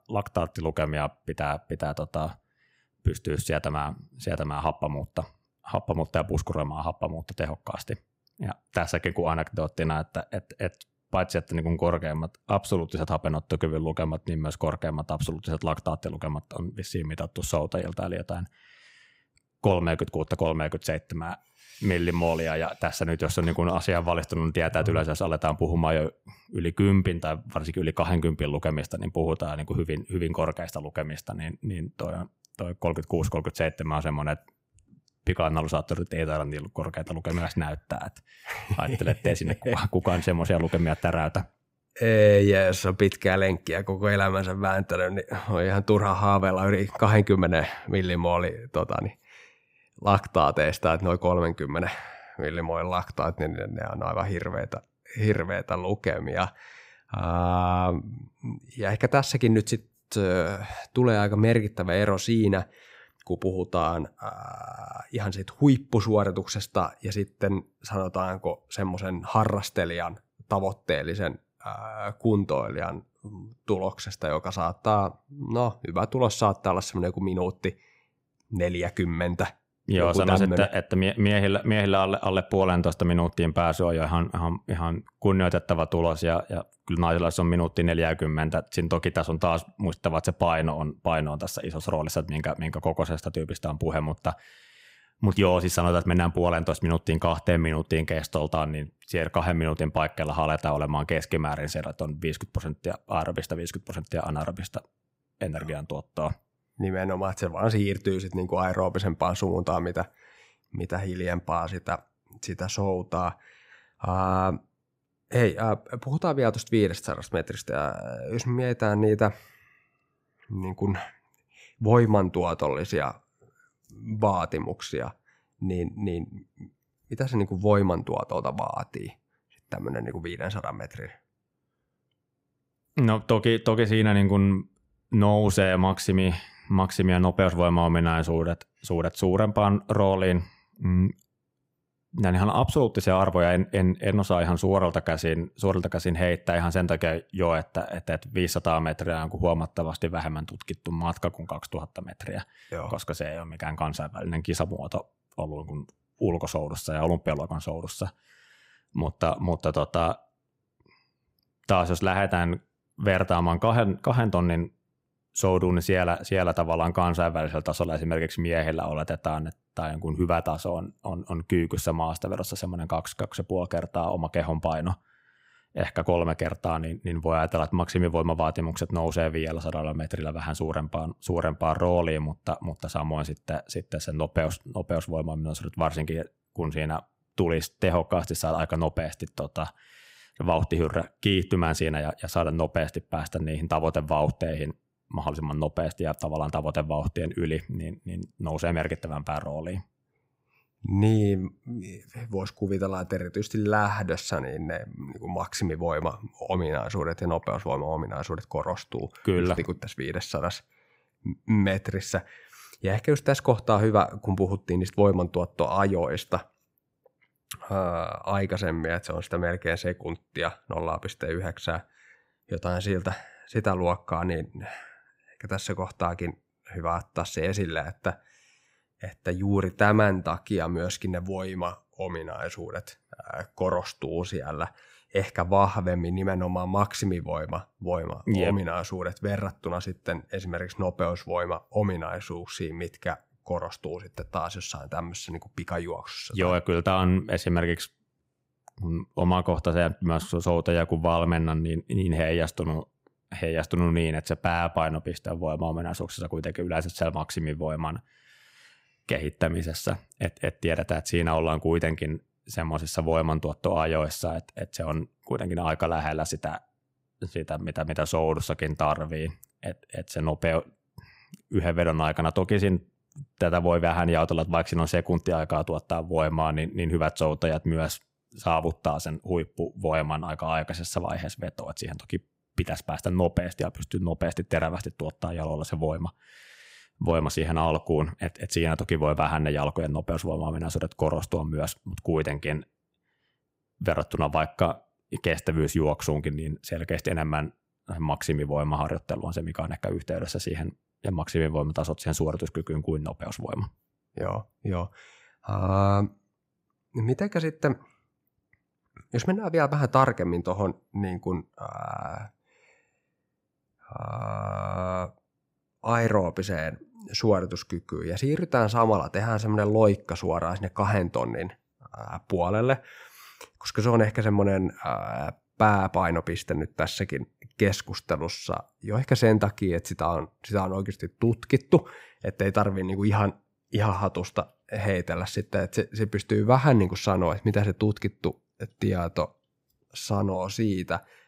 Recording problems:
none

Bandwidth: 15.5 kHz